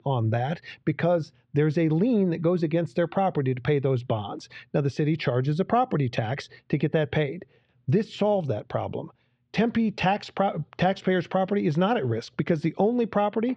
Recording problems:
muffled; slightly; fading above 3.5 kHz

